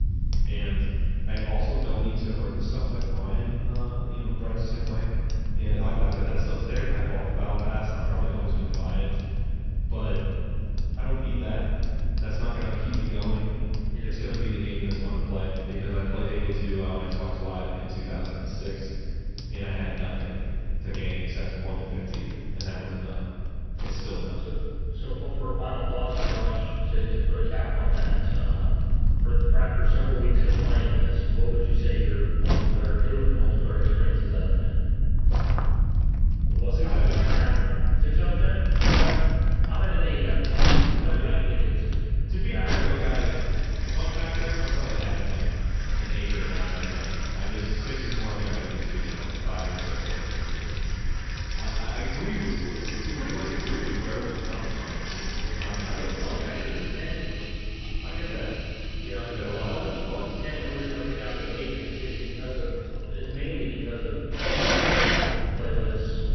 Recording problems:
room echo; strong; dies away in 2.3 s
off-mic speech; far
high frequencies cut off; noticeable; nothing above 6 kHz
household noises; very loud; throughout; 1 dB above the speech
low rumble; noticeable; throughout; 10 dB below the speech

